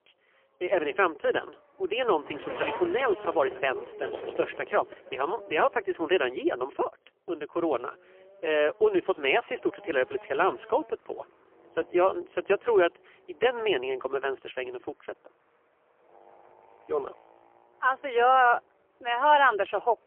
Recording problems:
phone-call audio; poor line; nothing above 3 kHz
traffic noise; noticeable; throughout; 15 dB below the speech

